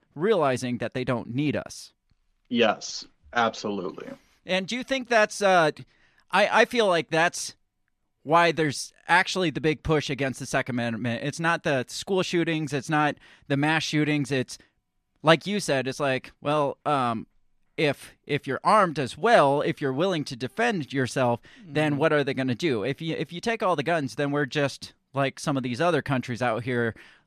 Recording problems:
none

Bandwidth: 14.5 kHz